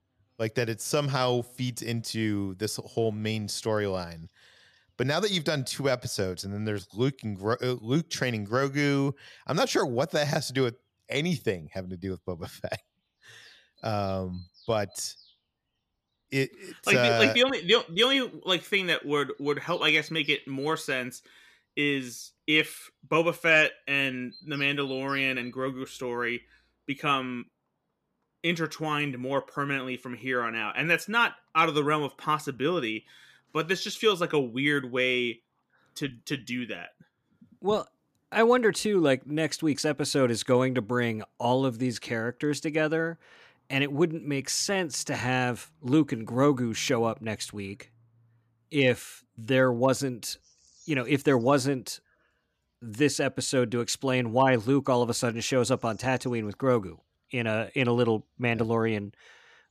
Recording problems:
animal sounds; faint; throughout; 30 dB below the speech

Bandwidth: 14.5 kHz